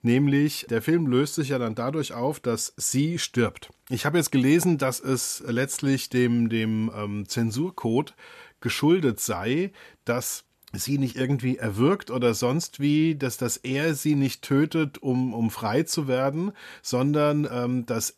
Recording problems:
none

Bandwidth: 13.5 kHz